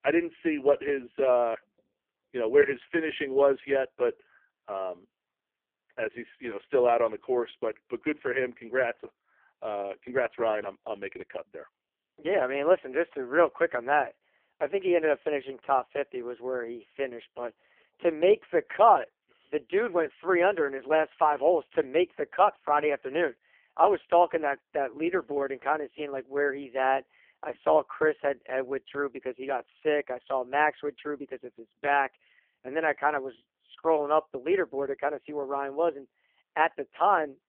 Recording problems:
phone-call audio; poor line

